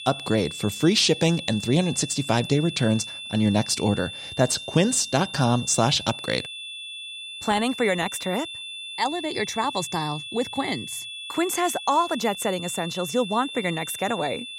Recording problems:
high-pitched whine; loud; throughout; 3.5 kHz, 10 dB below the speech

